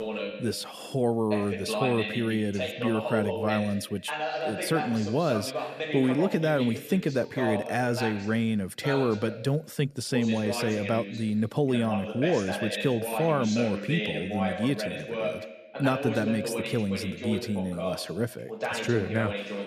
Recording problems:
voice in the background; loud; throughout; 5 dB below the speech

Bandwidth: 14.5 kHz